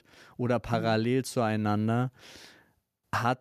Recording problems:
none

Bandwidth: 14.5 kHz